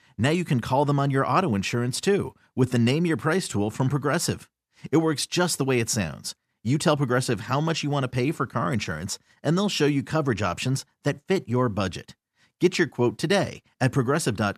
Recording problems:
none

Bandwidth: 14.5 kHz